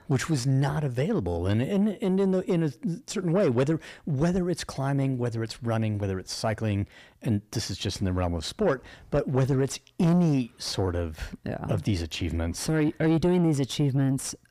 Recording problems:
distortion; slight; 10 dB below the speech

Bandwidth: 15 kHz